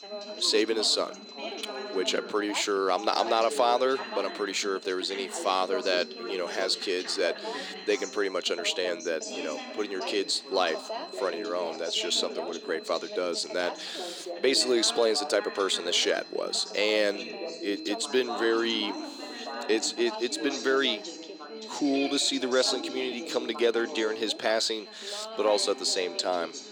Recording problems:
thin; somewhat; fading below 300 Hz
high-pitched whine; noticeable; throughout; 4 kHz, 20 dB below the speech
background chatter; noticeable; throughout; 3 voices, 10 dB below the speech

